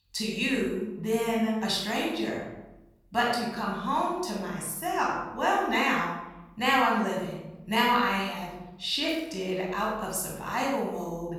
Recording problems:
off-mic speech; far
room echo; noticeable; dies away in 0.9 s

